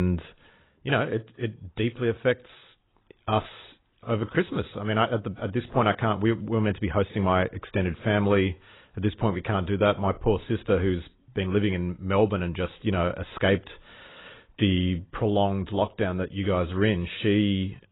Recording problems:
garbled, watery; badly; nothing above 3.5 kHz
abrupt cut into speech; at the start

